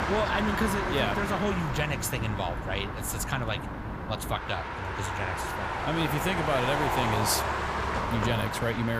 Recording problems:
traffic noise; loud; throughout; 1 dB below the speech
abrupt cut into speech; at the end

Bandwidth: 15 kHz